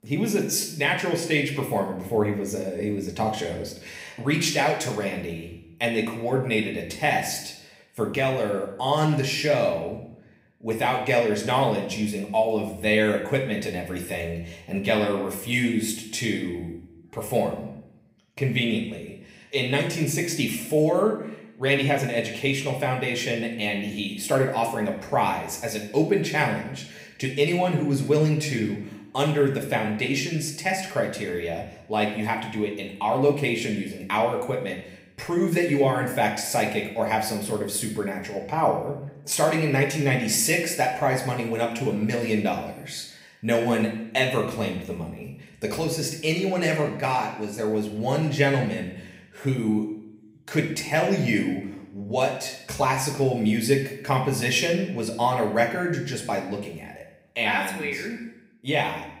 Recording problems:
room echo; slight; dies away in 0.7 s
off-mic speech; somewhat distant

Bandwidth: 15.5 kHz